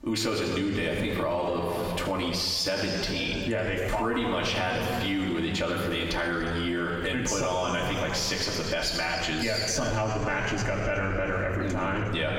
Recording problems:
off-mic speech; far
squashed, flat; heavily
room echo; noticeable; dies away in 2.5 s

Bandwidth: 16.5 kHz